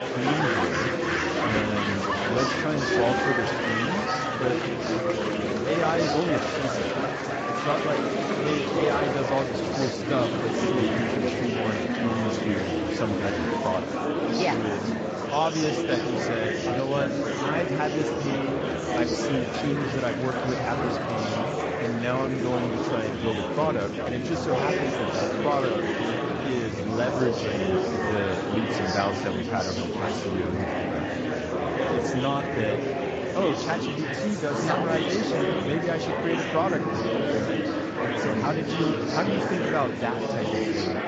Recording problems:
garbled, watery; slightly; nothing above 7.5 kHz
murmuring crowd; very loud; throughout; 3 dB above the speech
animal sounds; faint; throughout; 25 dB below the speech

